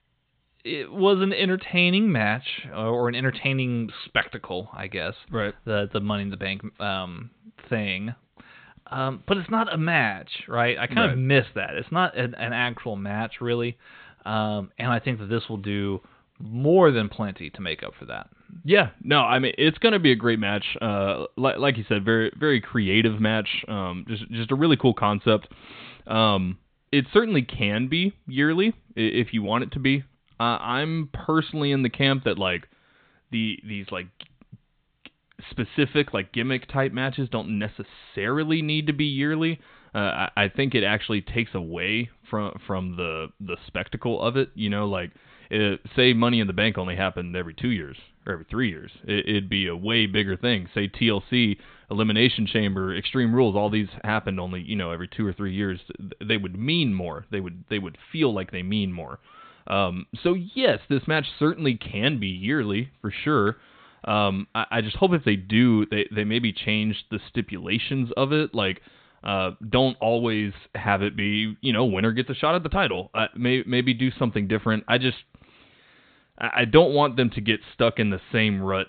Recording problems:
high frequencies cut off; severe; nothing above 4 kHz

